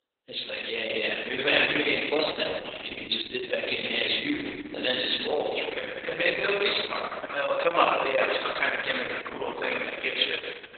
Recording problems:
garbled, watery; badly; nothing above 4 kHz
thin; very; fading below 450 Hz
room echo; noticeable; dies away in 1.7 s
off-mic speech; somewhat distant

